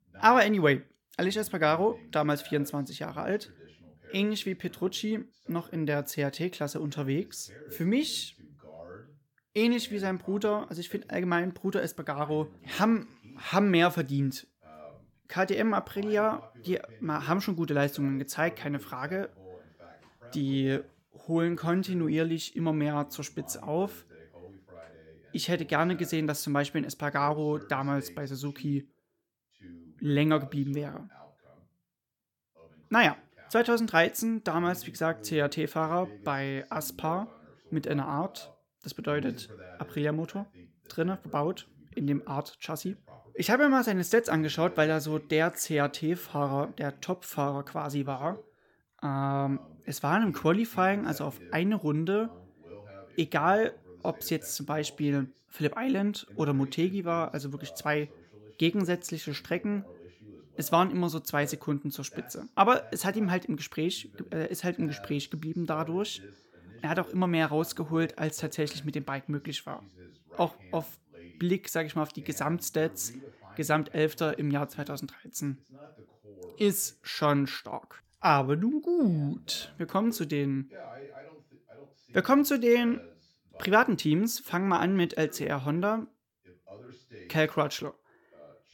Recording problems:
voice in the background; faint; throughout; 25 dB below the speech

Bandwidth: 17 kHz